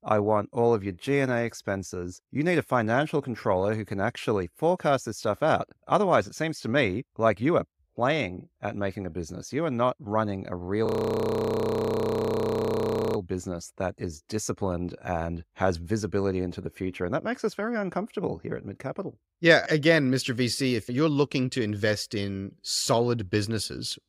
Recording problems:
audio freezing; at 11 s for 2.5 s

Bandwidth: 15.5 kHz